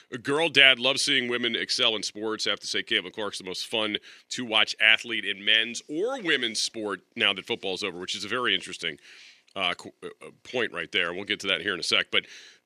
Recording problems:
thin; somewhat; fading below 300 Hz

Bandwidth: 14.5 kHz